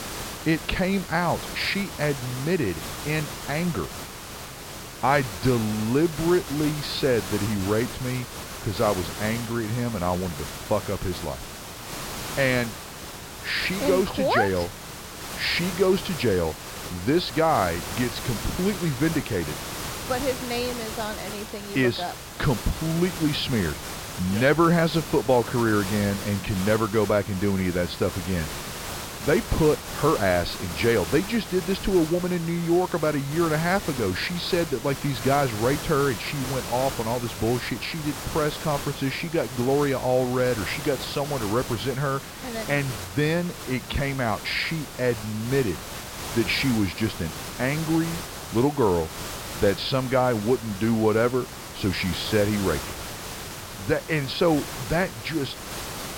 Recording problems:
high frequencies cut off; noticeable; nothing above 5.5 kHz
hiss; loud; throughout; 9 dB below the speech

